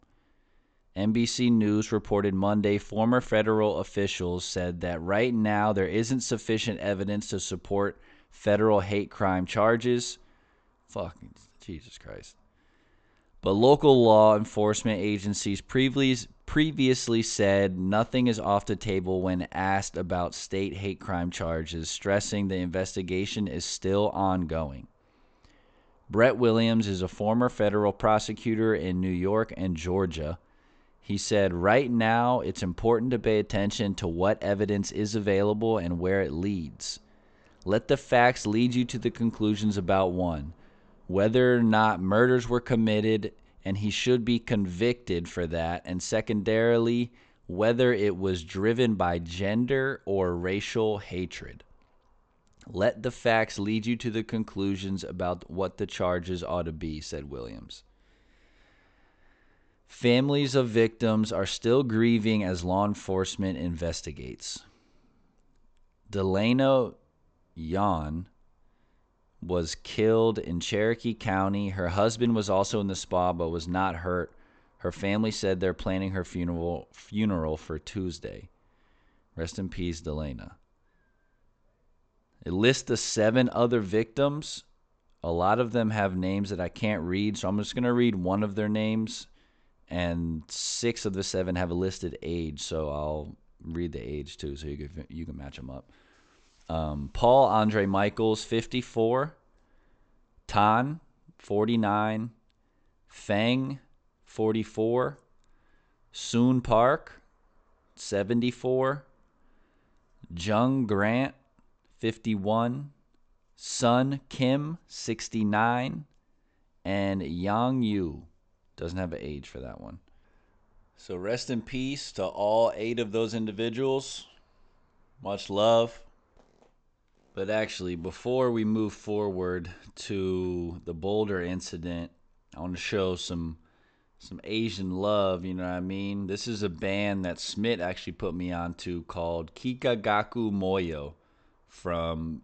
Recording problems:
high frequencies cut off; noticeable; nothing above 8 kHz

